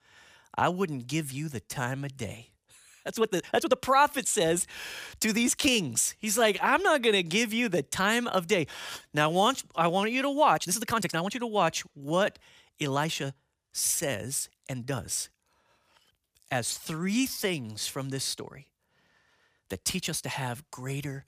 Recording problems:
uneven, jittery; strongly; from 1.5 to 20 s

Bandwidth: 15 kHz